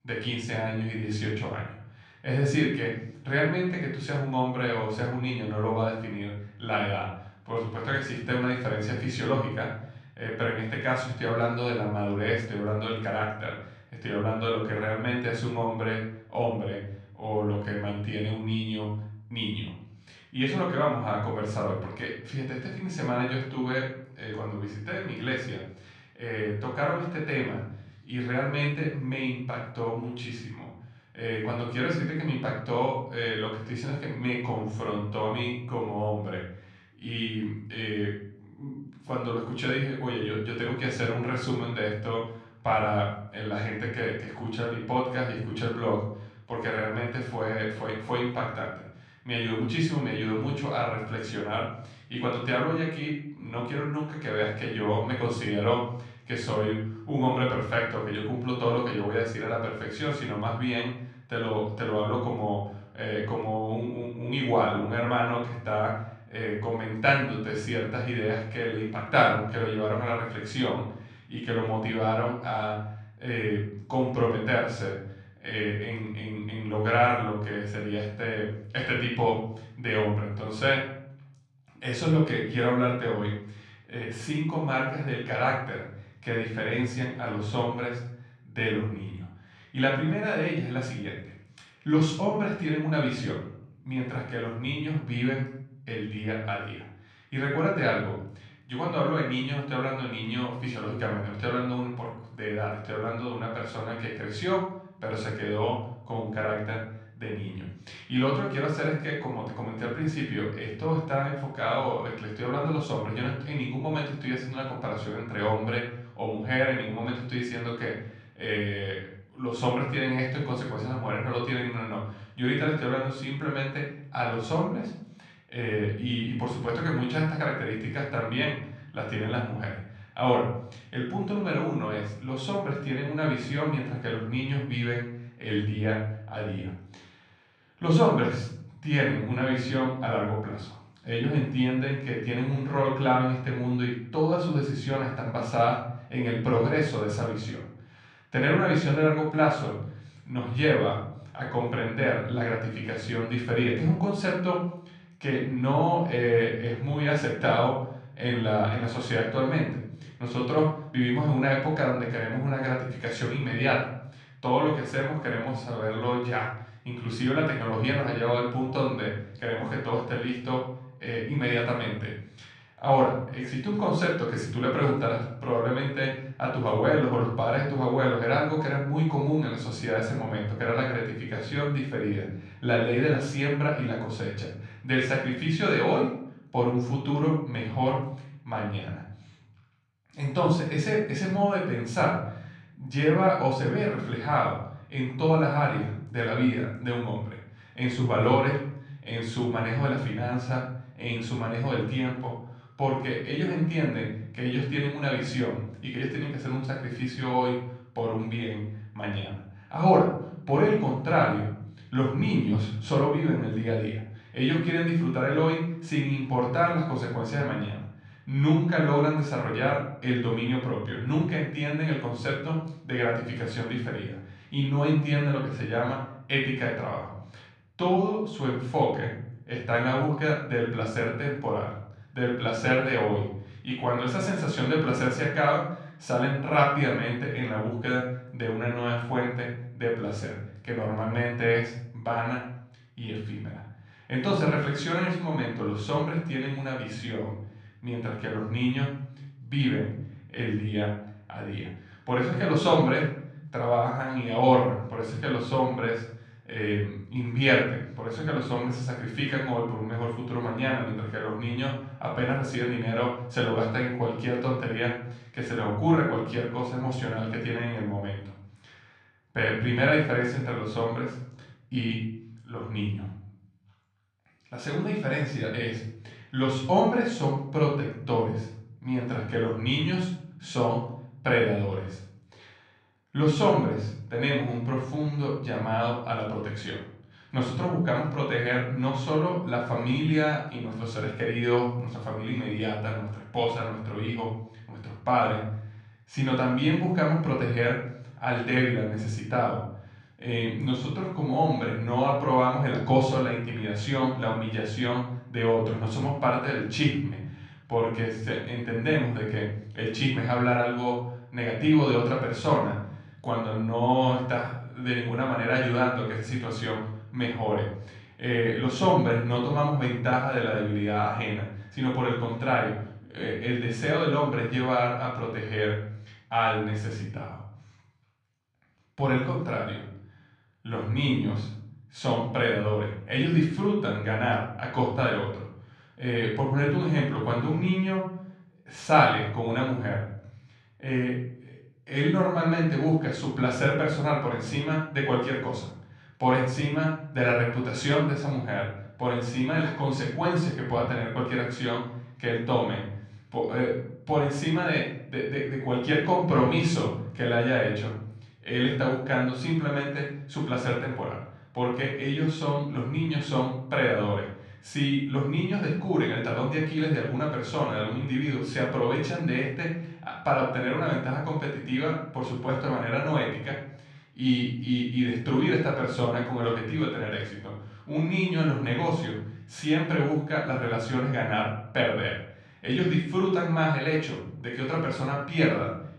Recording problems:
off-mic speech; far
room echo; noticeable; dies away in 0.7 s

